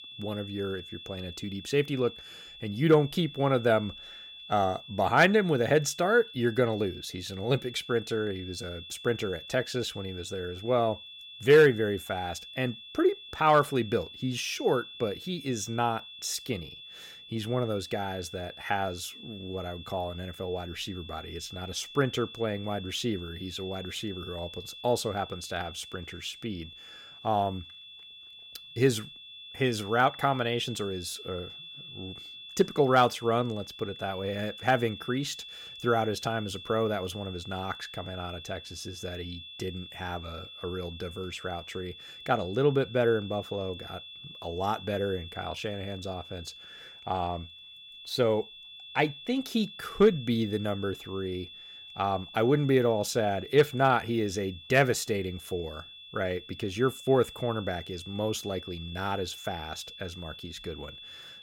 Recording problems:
high-pitched whine; noticeable; throughout; 3.5 kHz, 15 dB below the speech

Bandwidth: 16.5 kHz